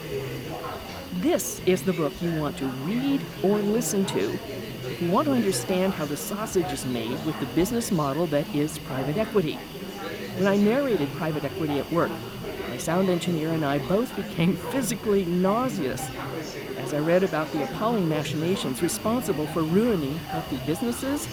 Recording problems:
chatter from many people; loud; throughout; 9 dB below the speech
hiss; noticeable; throughout; 15 dB below the speech

